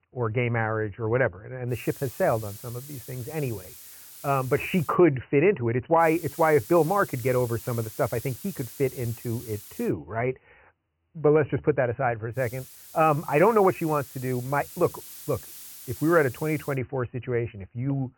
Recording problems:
high frequencies cut off; severe; nothing above 3 kHz
hiss; noticeable; from 1.5 to 5 s, from 6 to 10 s and from 12 to 17 s; 15 dB below the speech

